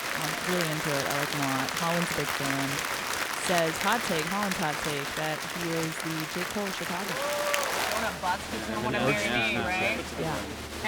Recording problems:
crowd noise; very loud; throughout; 3 dB above the speech

